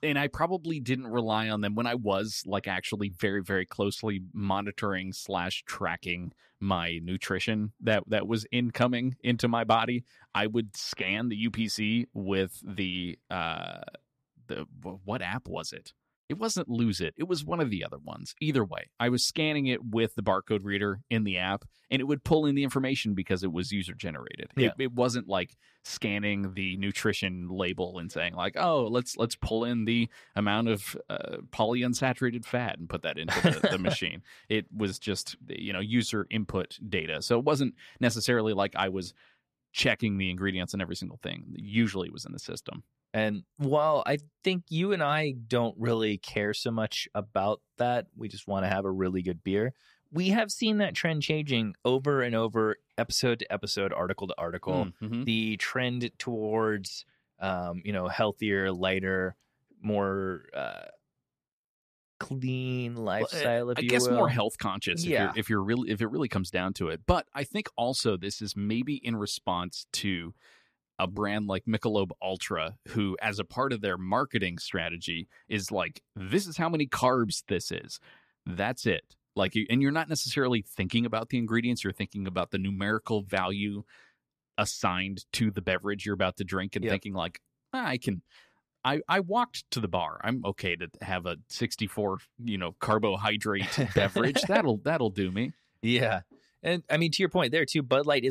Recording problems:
abrupt cut into speech; at the end

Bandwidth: 14.5 kHz